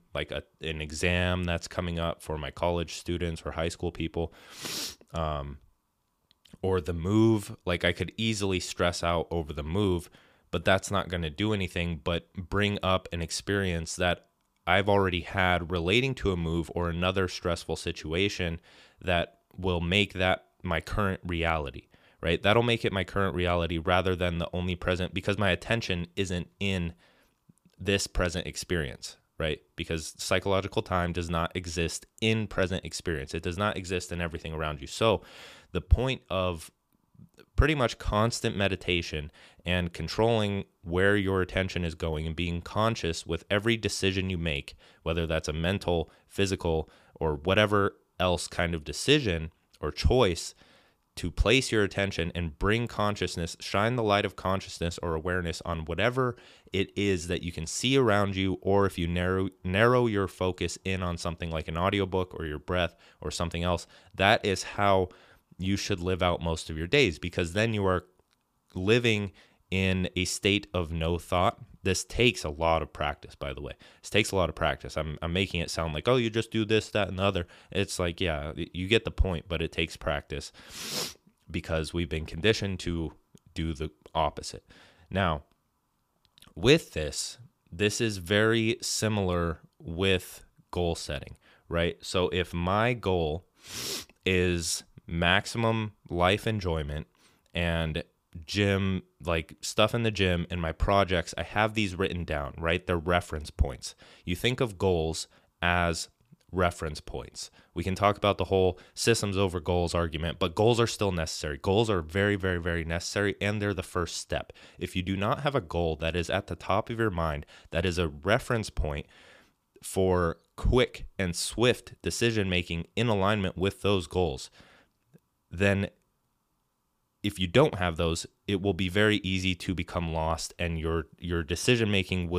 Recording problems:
abrupt cut into speech; at the end

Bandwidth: 15 kHz